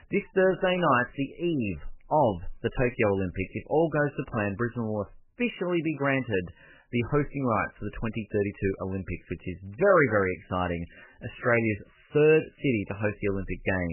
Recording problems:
garbled, watery; badly; nothing above 3 kHz
abrupt cut into speech; at the end

